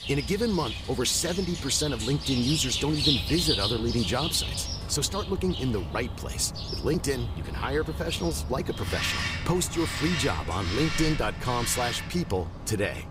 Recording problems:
animal sounds; loud; throughout; 3 dB below the speech

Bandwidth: 15.5 kHz